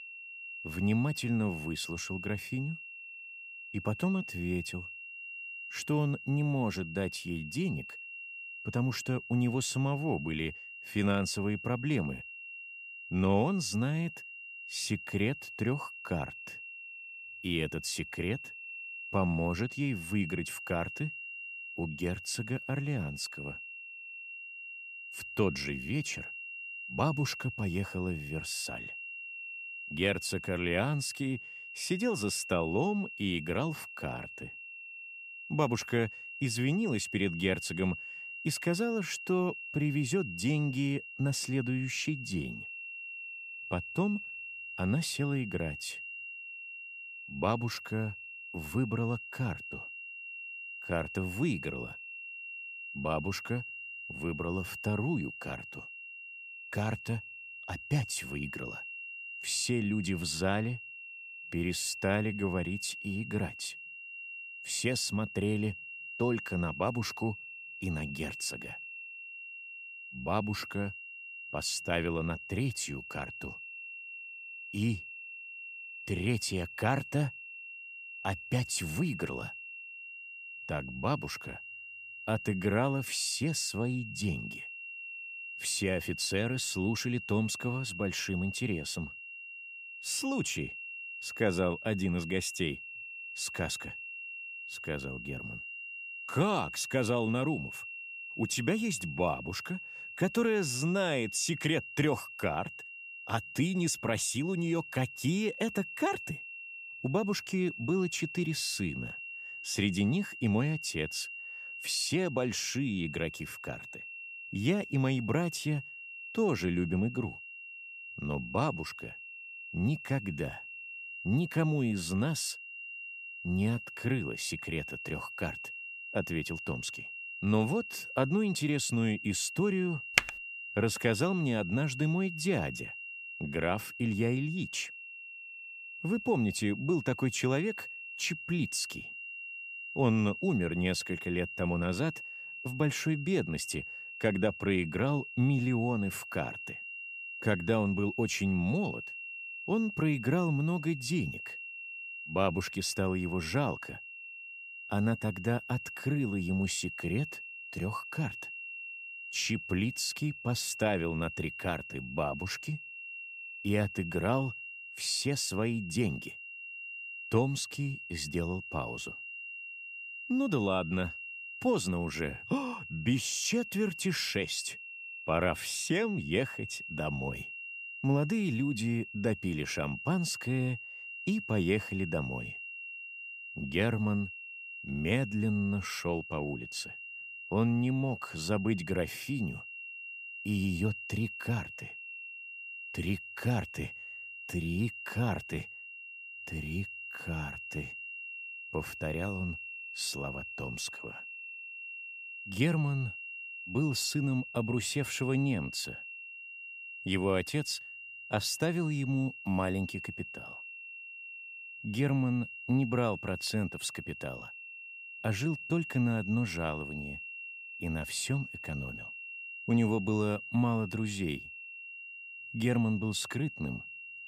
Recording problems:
high-pitched whine; loud; throughout; 2.5 kHz, 8 dB below the speech
keyboard typing; very faint; at 2:10; peak 5 dB above the speech

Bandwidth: 15 kHz